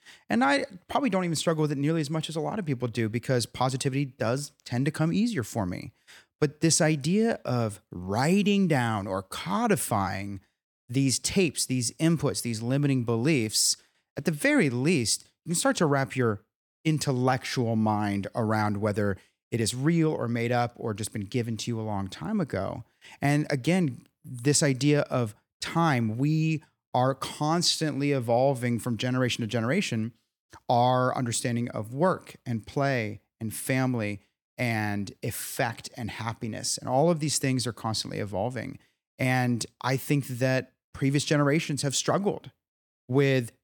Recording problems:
none

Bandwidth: 18 kHz